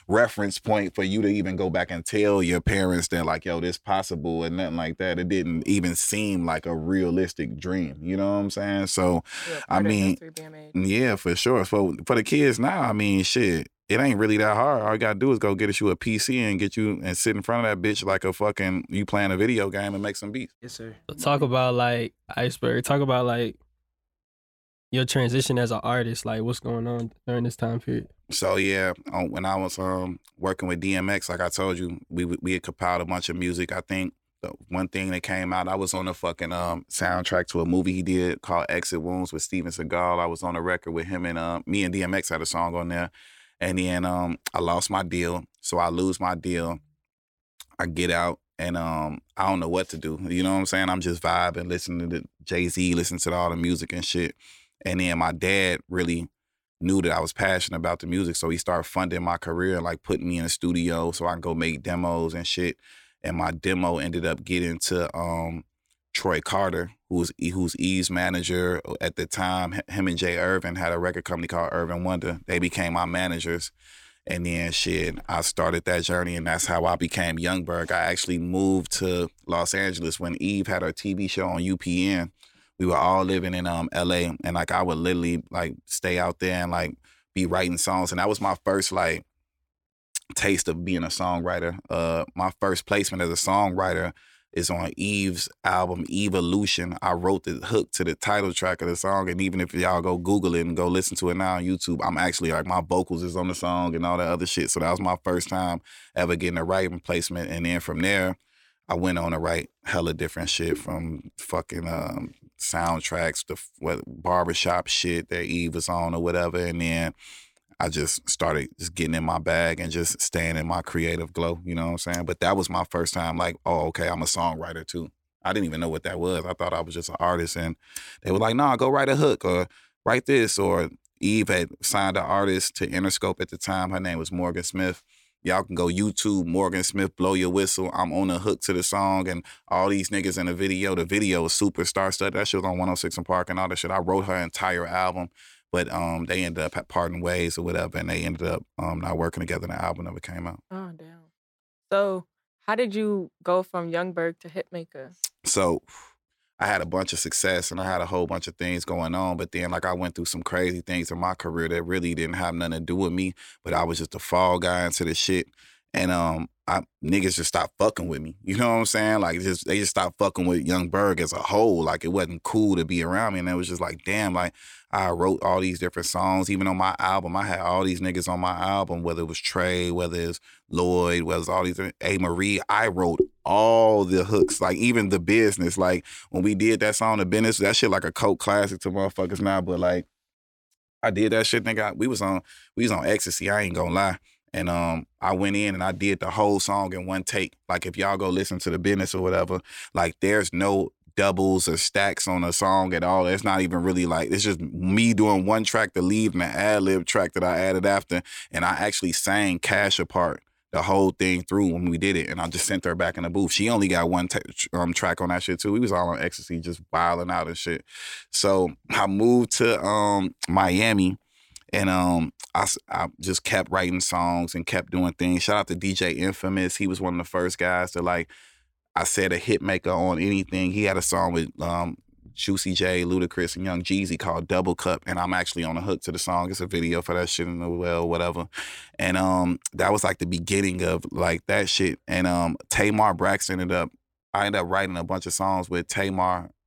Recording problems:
none

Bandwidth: 17.5 kHz